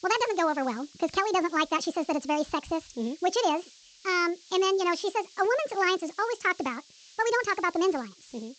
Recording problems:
wrong speed and pitch; too fast and too high; 1.5 times normal speed
high frequencies cut off; noticeable; nothing above 8 kHz
hiss; faint; throughout; 25 dB below the speech

